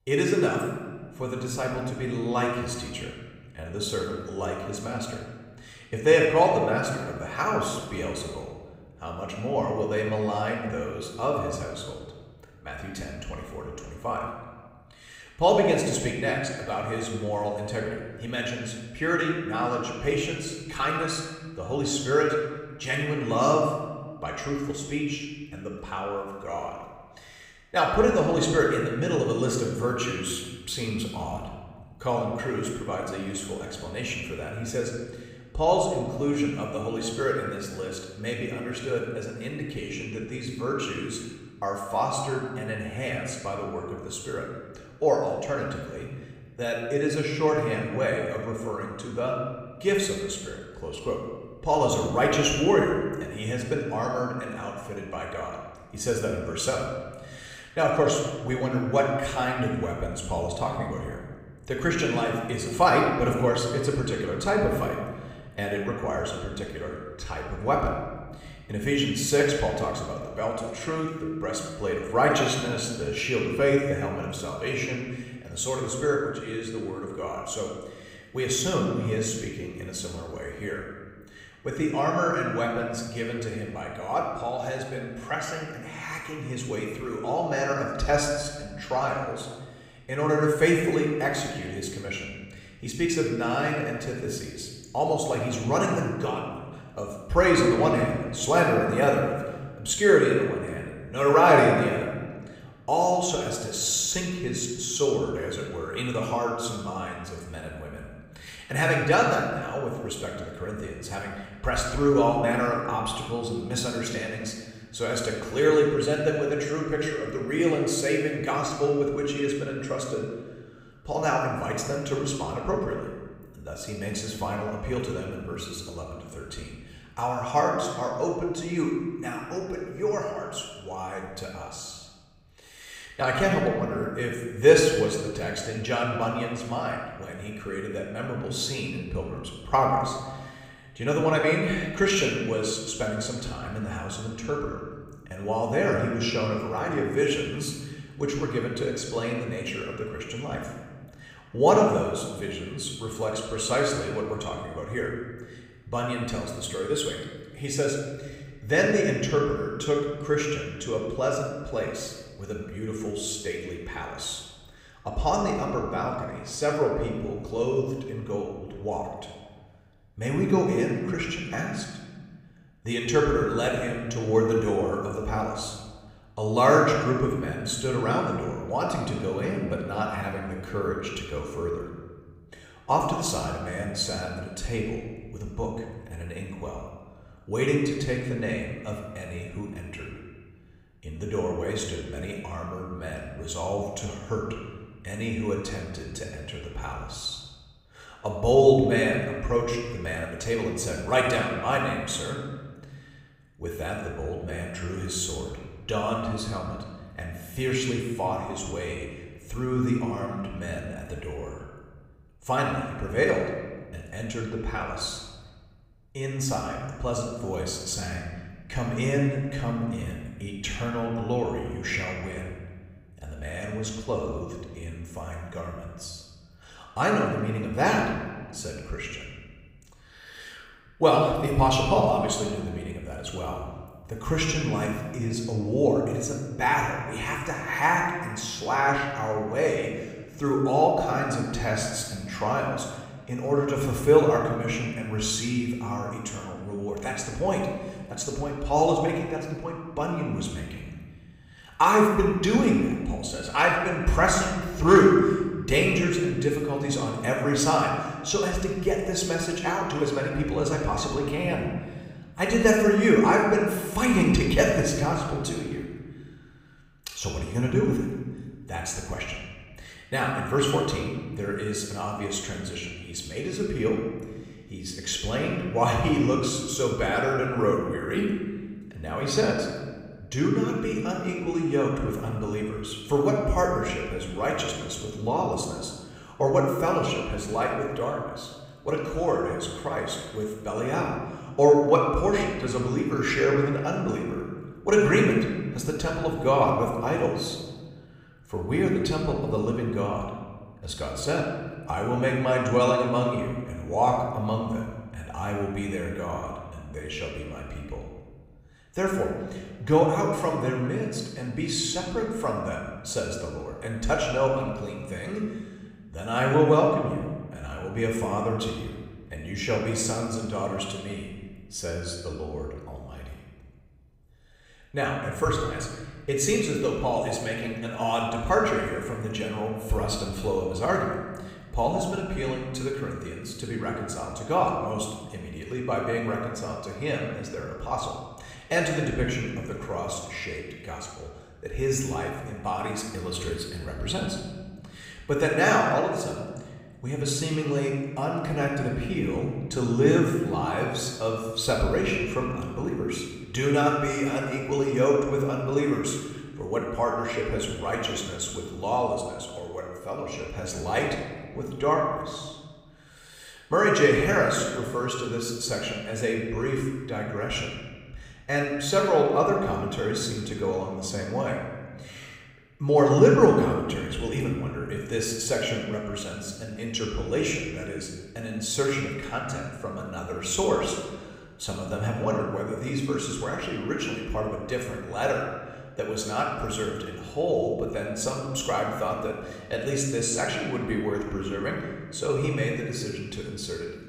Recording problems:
off-mic speech; far
room echo; noticeable; dies away in 1.3 s

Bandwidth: 15.5 kHz